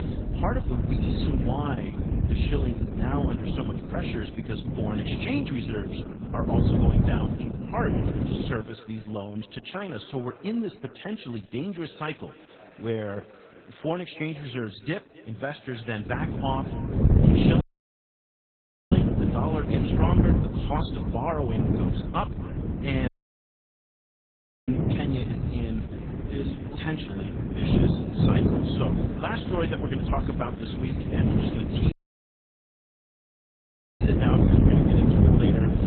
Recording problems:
garbled, watery; badly; nothing above 4 kHz
echo of what is said; faint; throughout; 270 ms later, 20 dB below the speech
wind noise on the microphone; heavy; until 8.5 s and from 16 s on; 1 dB above the speech
chatter from many people; noticeable; throughout; 20 dB below the speech
audio cutting out; at 18 s for 1.5 s, at 23 s for 1.5 s and at 32 s for 2 s

